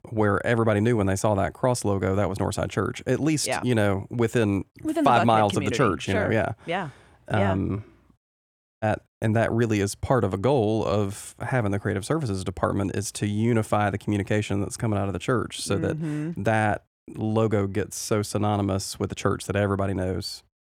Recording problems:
audio cutting out; at 8.5 s

